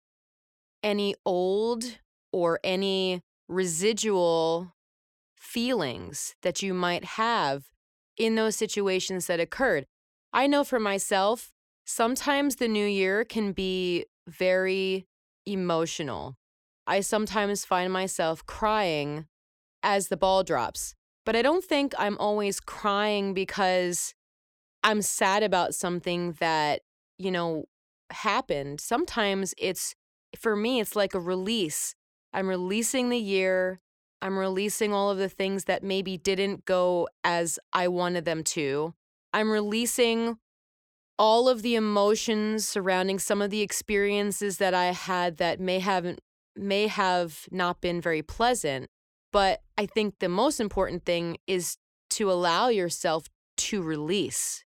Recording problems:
none

